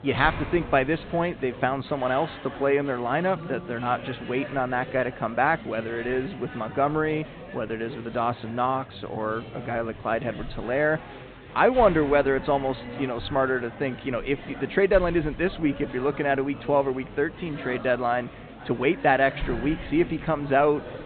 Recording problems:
high frequencies cut off; severe; nothing above 4 kHz
murmuring crowd; noticeable; throughout; 15 dB below the speech

